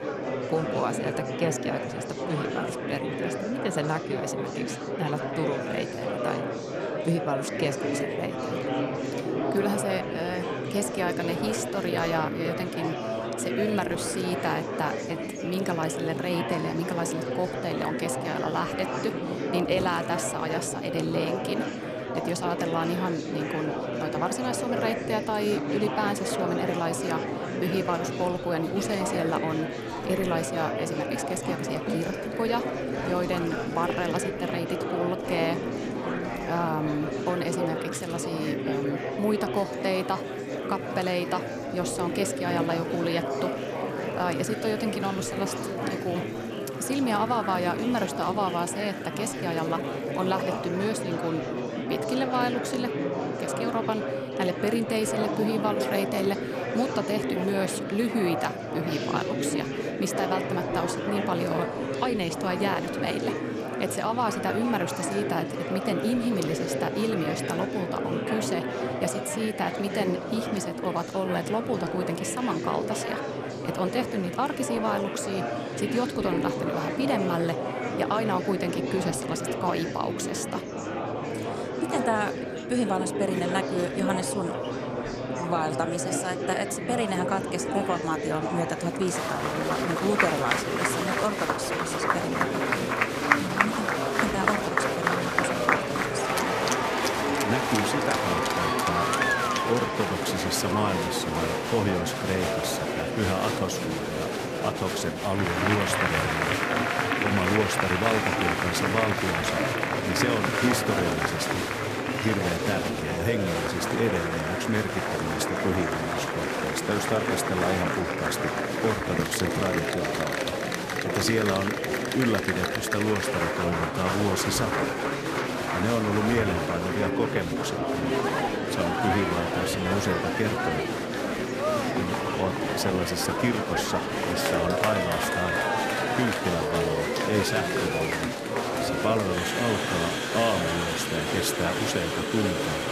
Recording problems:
murmuring crowd; very loud; throughout; 1 dB above the speech
rain or running water; noticeable; throughout; 20 dB below the speech

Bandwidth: 14.5 kHz